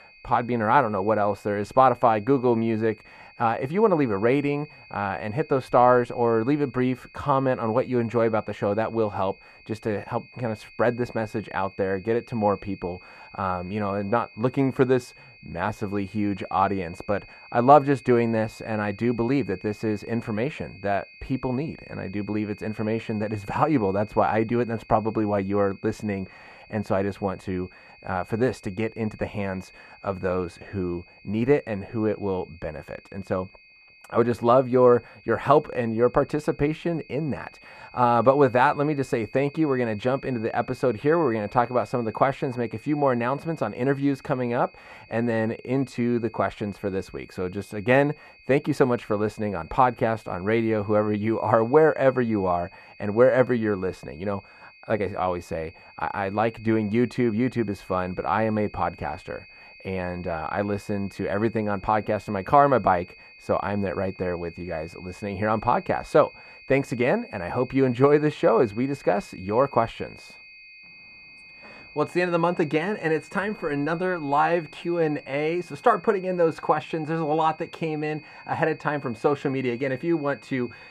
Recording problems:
muffled; very; fading above 2.5 kHz
high-pitched whine; faint; throughout; 2.5 kHz, 25 dB below the speech

